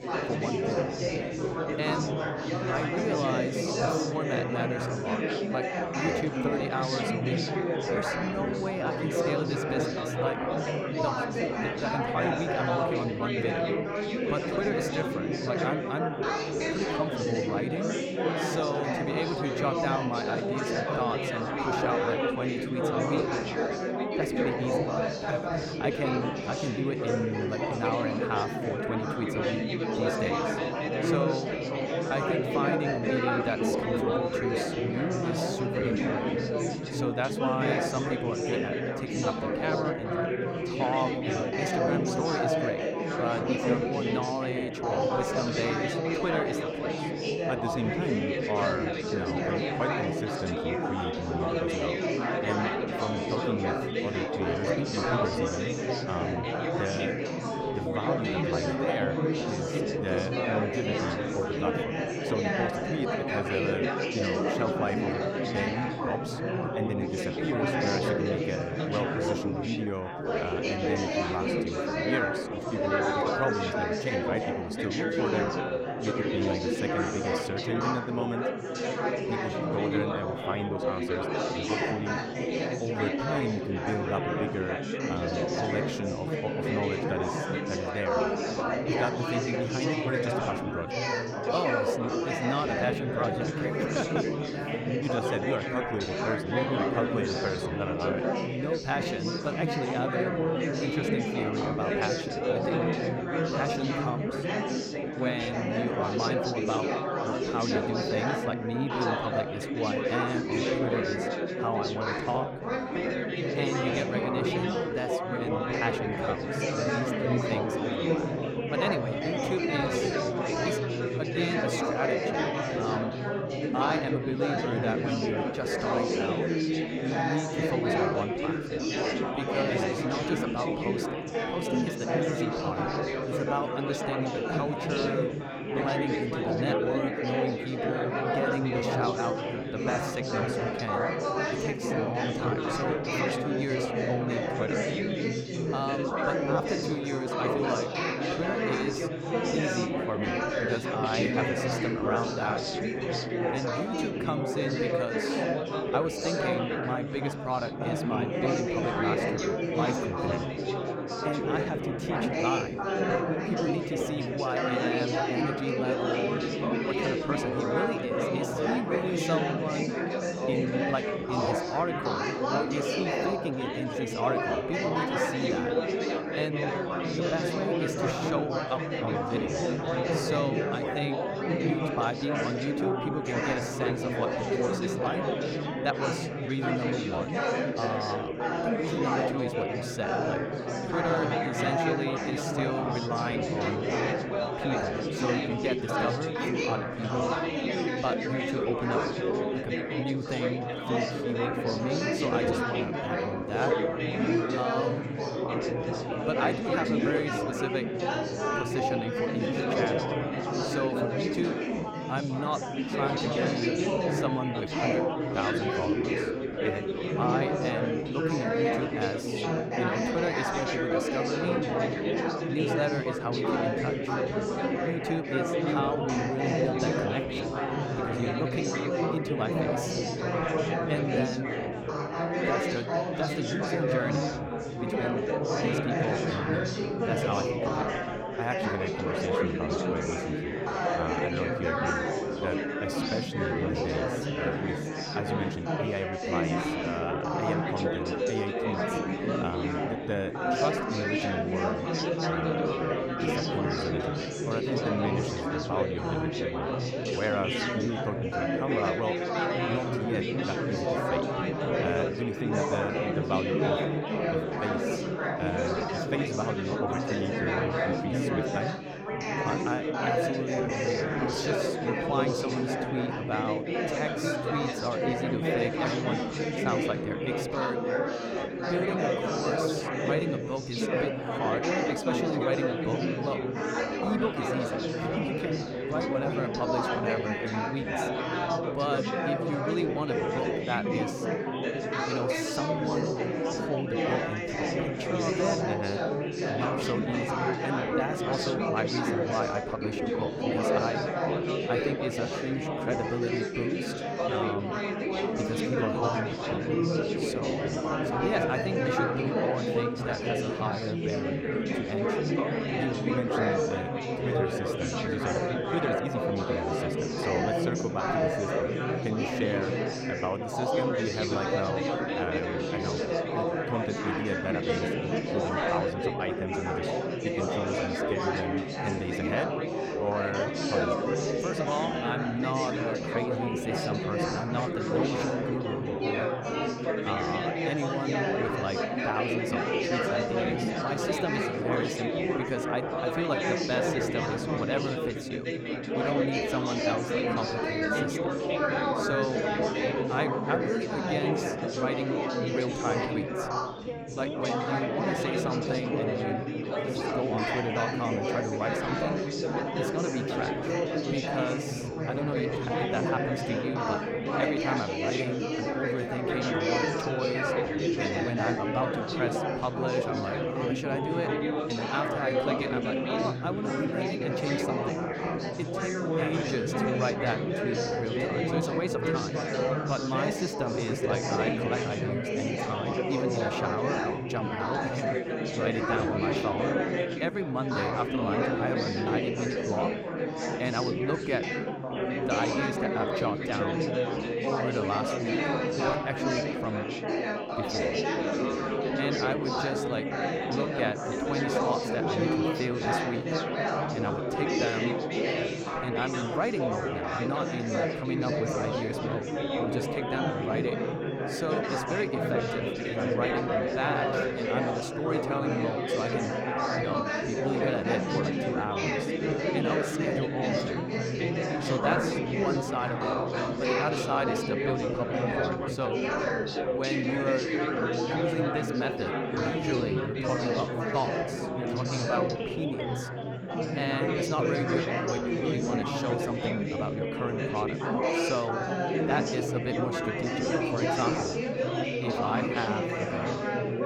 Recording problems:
chatter from many people; very loud; throughout; 5 dB above the speech

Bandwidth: 18 kHz